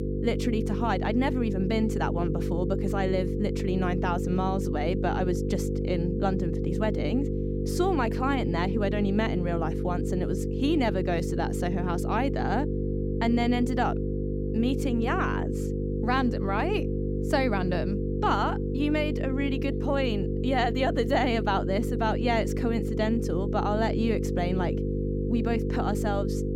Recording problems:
electrical hum; loud; throughout; 50 Hz, 5 dB below the speech

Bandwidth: 16 kHz